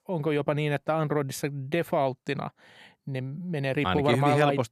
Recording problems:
none

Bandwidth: 14.5 kHz